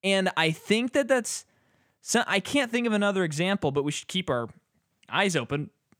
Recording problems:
none

